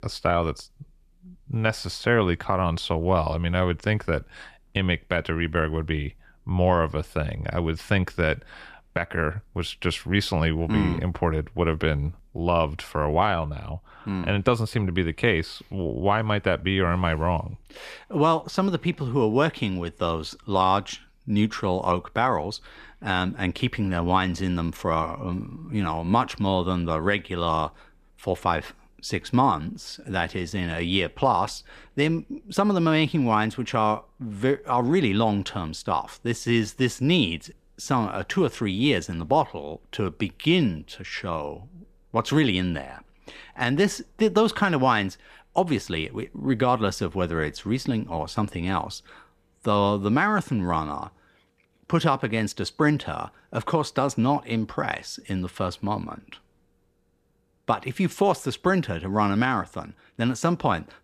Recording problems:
none

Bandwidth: 14.5 kHz